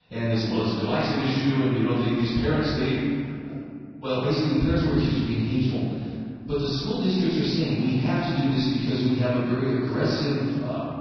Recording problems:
room echo; strong; dies away in 2.3 s
off-mic speech; far
garbled, watery; badly; nothing above 5.5 kHz

